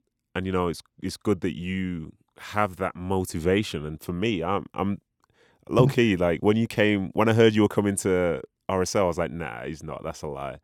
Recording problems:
none

